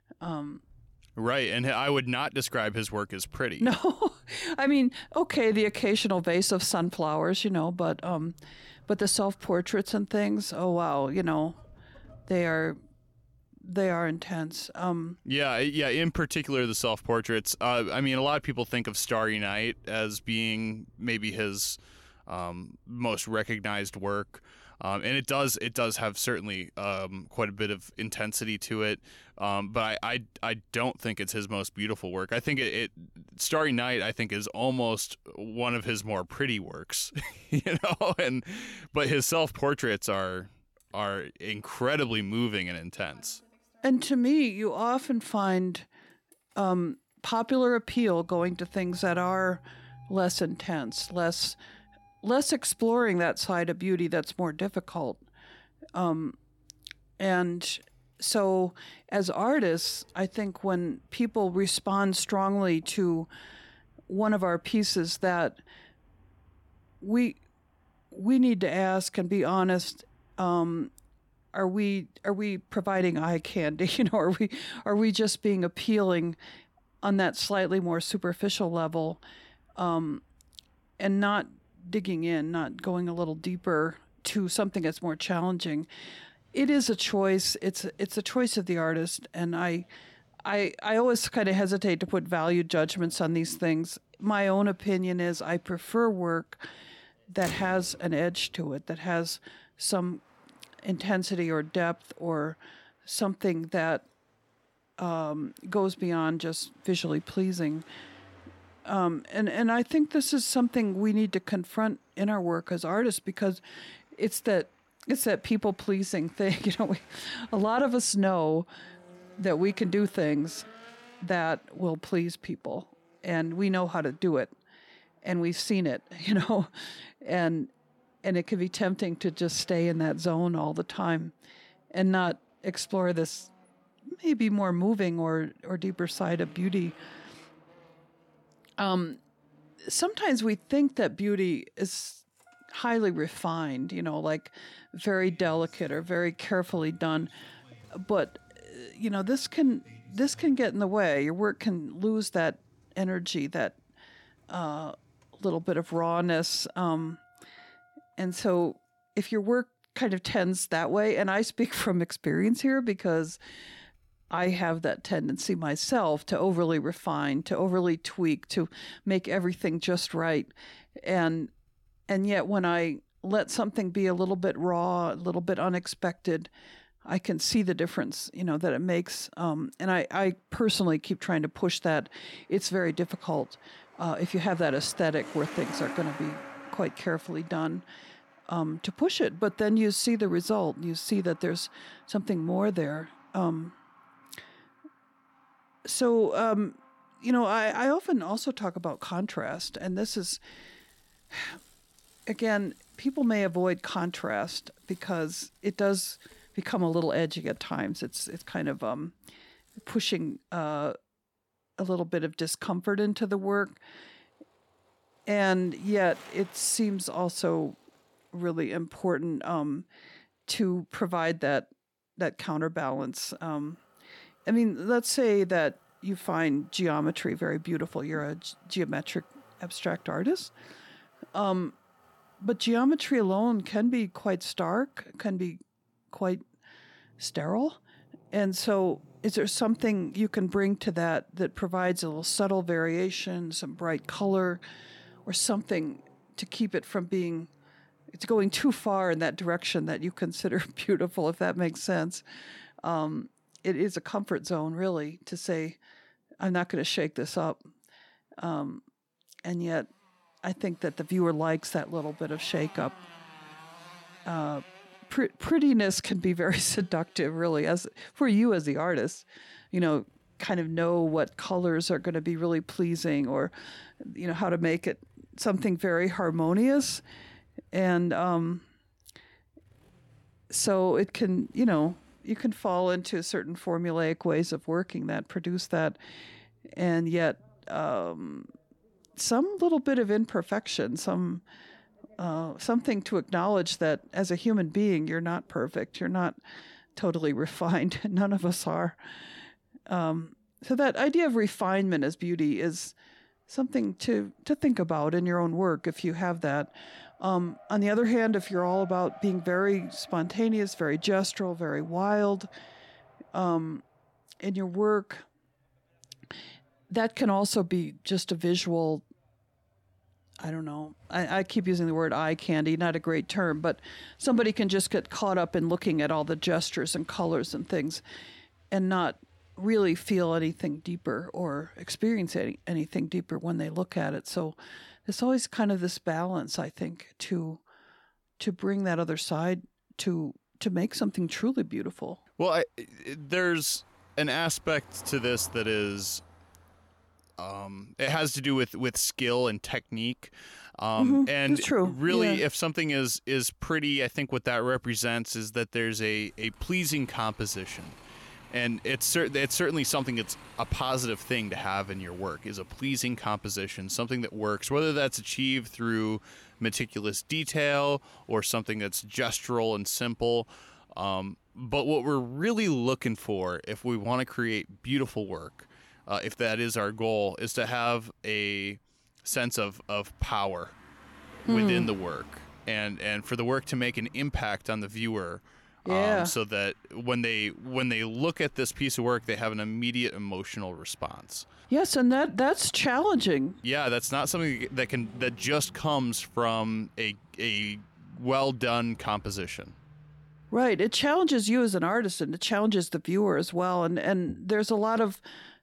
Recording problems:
traffic noise; faint; throughout; 25 dB below the speech

